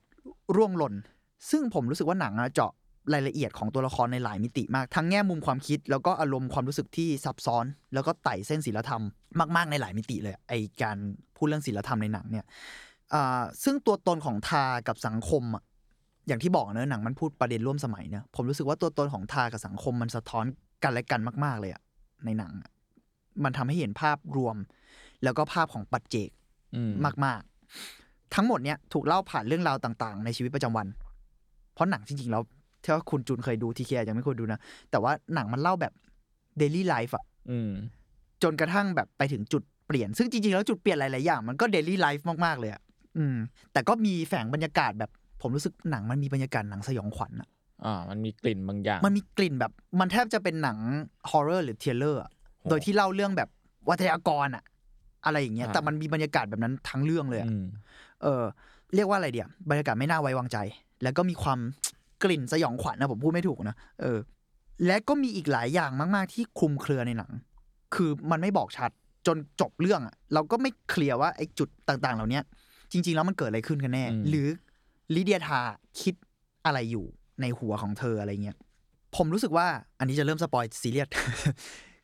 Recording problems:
none

